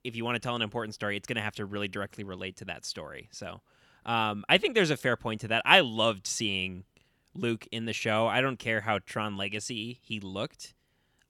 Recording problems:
none

